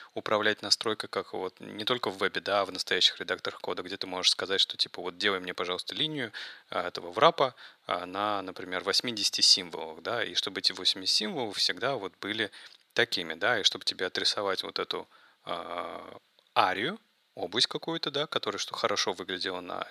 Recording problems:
thin; very; fading below 500 Hz

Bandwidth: 14.5 kHz